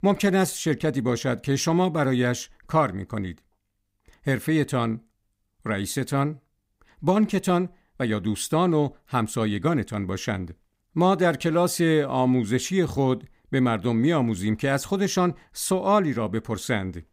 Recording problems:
none

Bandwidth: 15.5 kHz